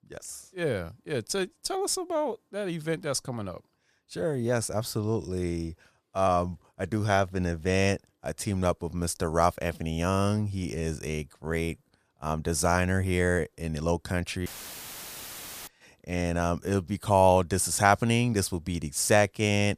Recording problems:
audio cutting out; filled with static; at 14 s for 1 s

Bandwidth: 15 kHz